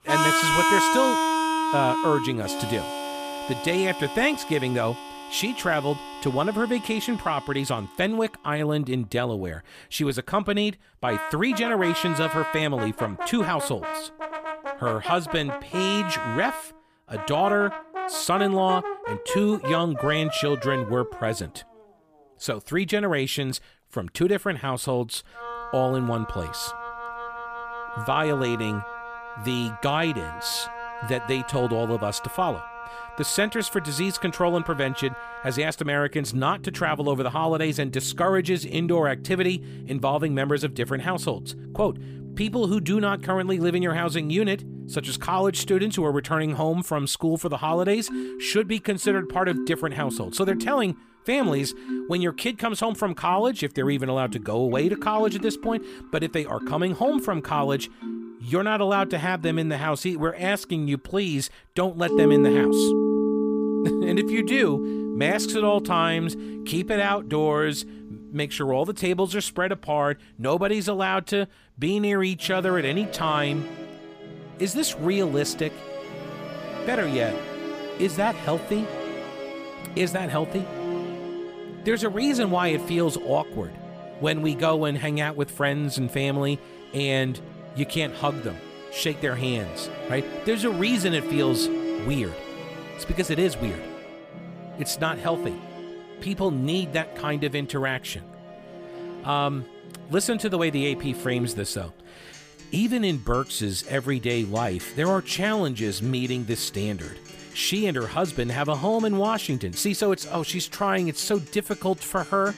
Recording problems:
background music; loud; throughout; 6 dB below the speech

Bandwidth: 15 kHz